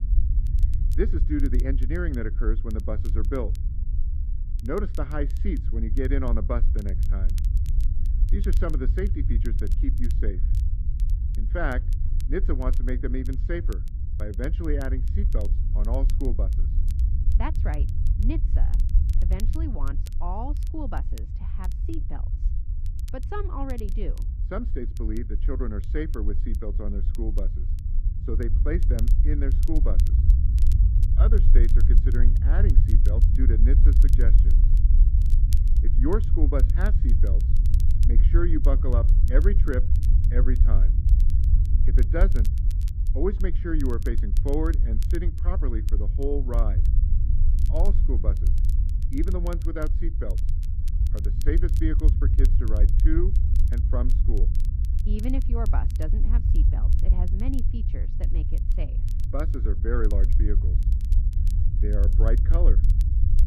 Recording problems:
muffled; very; fading above 1.5 kHz
low rumble; loud; throughout; 9 dB below the speech
crackle, like an old record; faint; 20 dB below the speech

